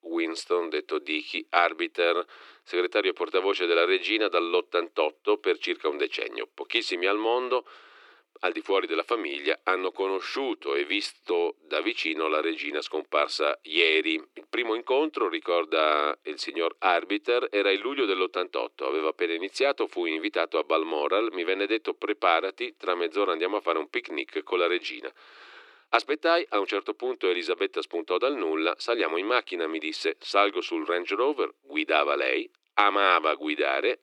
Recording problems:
thin; very; fading below 300 Hz

